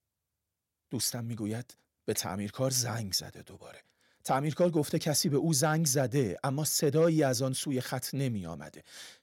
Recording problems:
none

